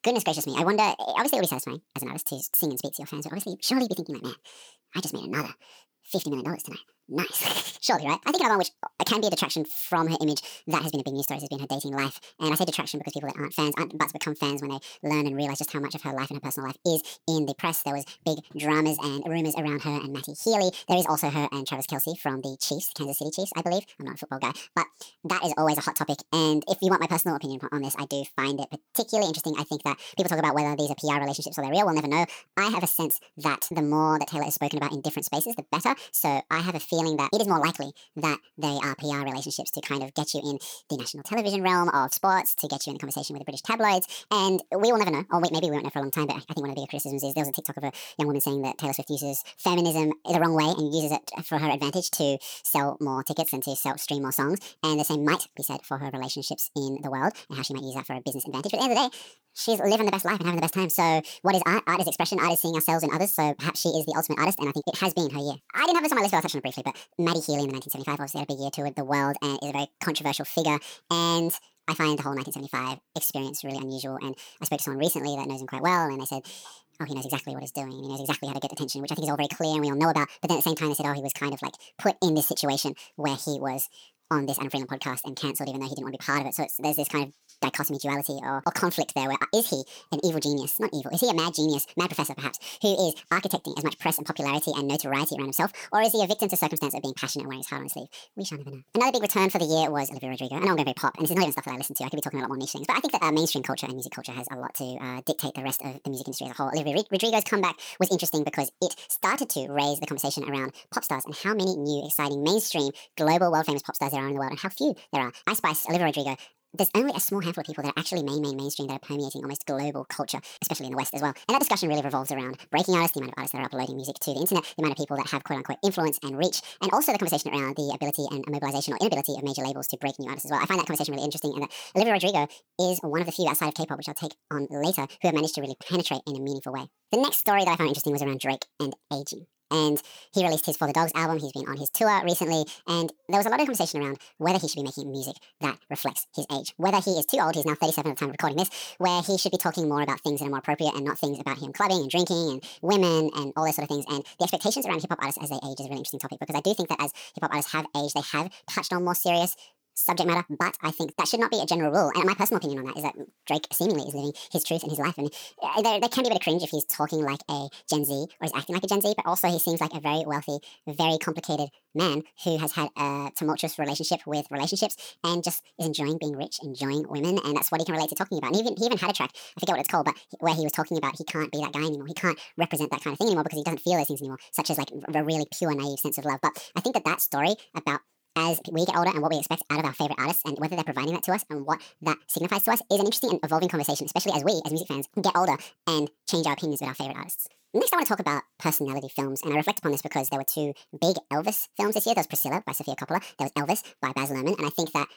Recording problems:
wrong speed and pitch; too fast and too high; 1.7 times normal speed

